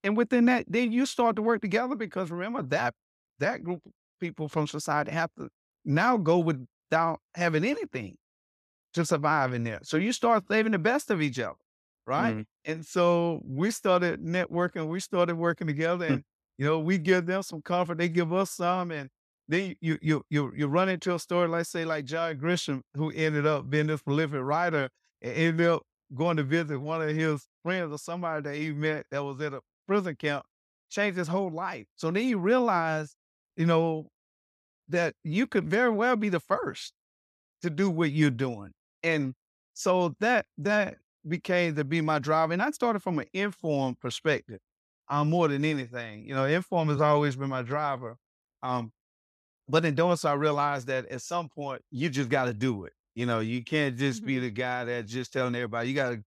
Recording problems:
uneven, jittery; slightly; from 3 to 56 s

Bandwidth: 14 kHz